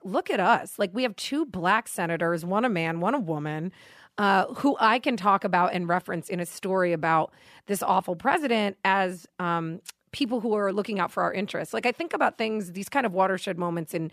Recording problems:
none

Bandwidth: 14.5 kHz